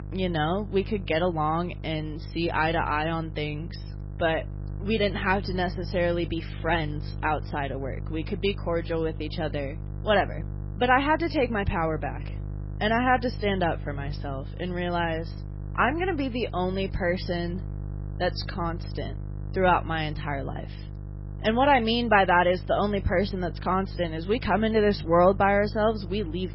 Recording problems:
garbled, watery; badly; nothing above 5.5 kHz
electrical hum; faint; throughout; 50 Hz, 25 dB below the speech

